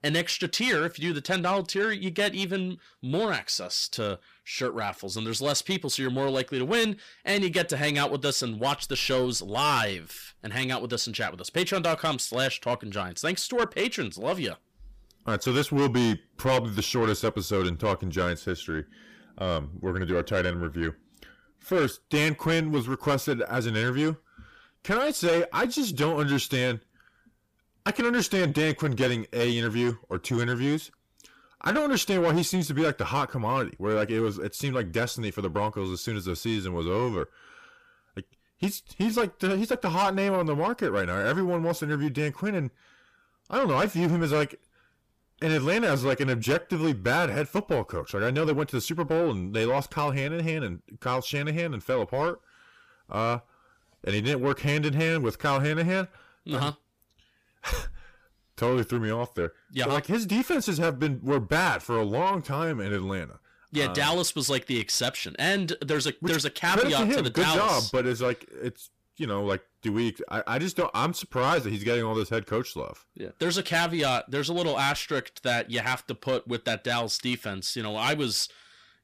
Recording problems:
distortion; heavy; 8 dB below the speech

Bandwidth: 15 kHz